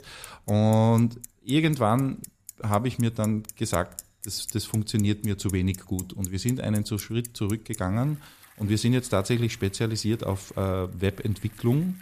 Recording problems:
traffic noise; noticeable; throughout; 15 dB below the speech

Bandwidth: 14.5 kHz